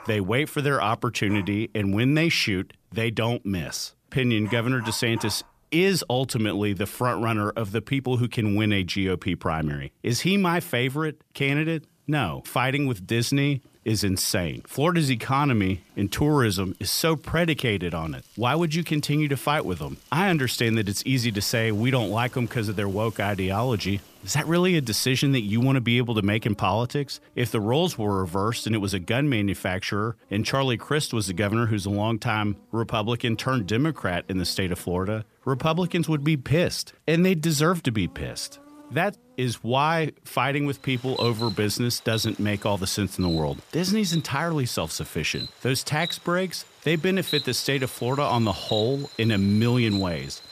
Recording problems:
animal sounds; noticeable; throughout; 15 dB below the speech

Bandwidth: 14.5 kHz